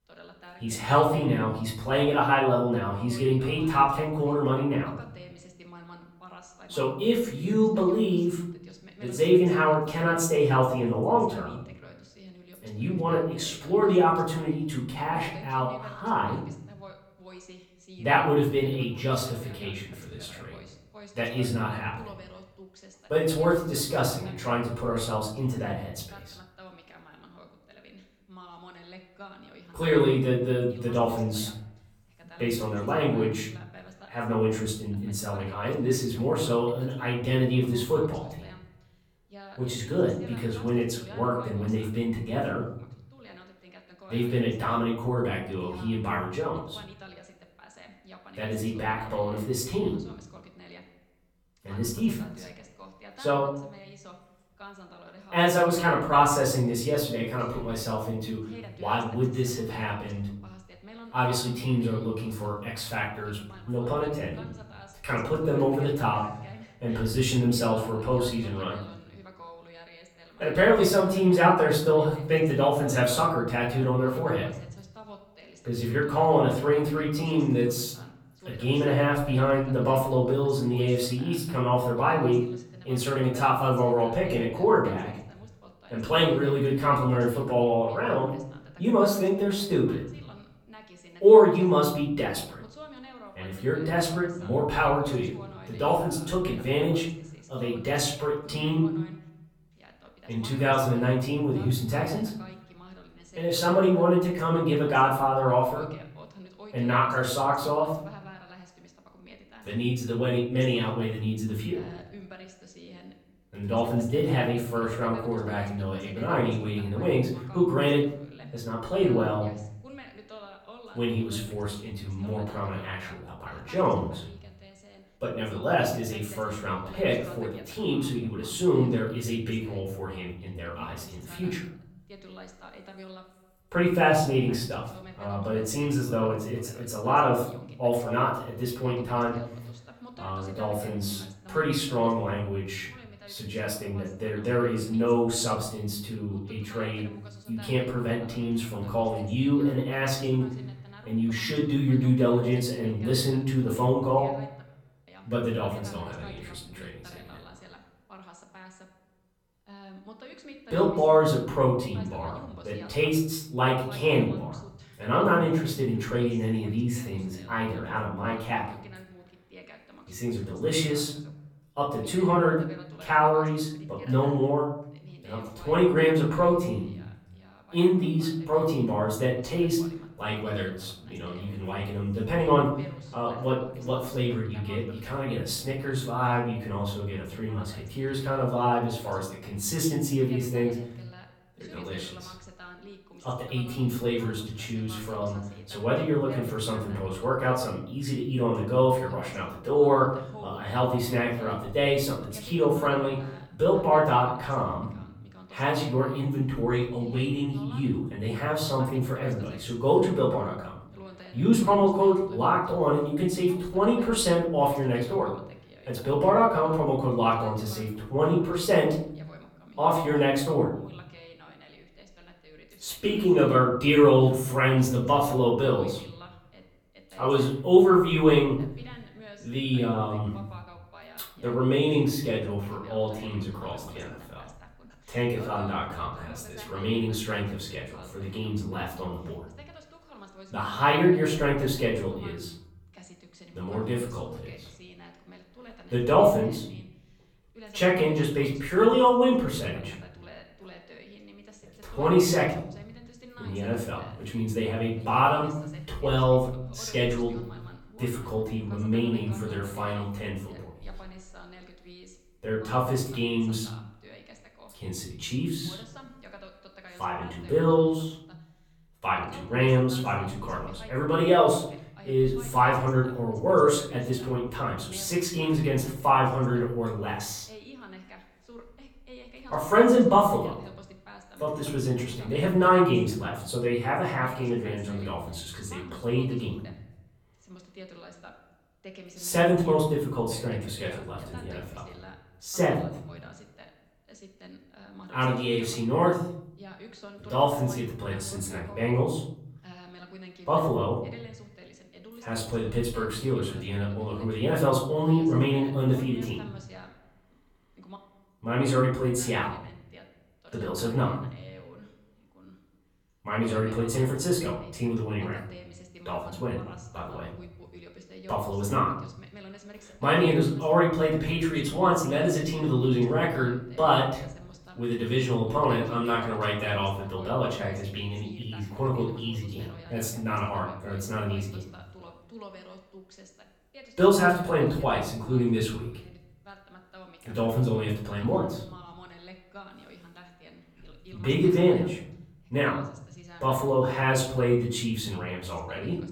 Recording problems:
off-mic speech; far
room echo; noticeable; dies away in 0.8 s
voice in the background; faint; throughout; 25 dB below the speech

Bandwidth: 17.5 kHz